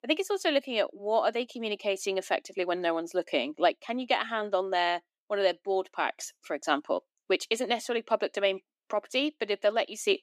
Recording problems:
thin; somewhat; fading below 300 Hz

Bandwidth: 15 kHz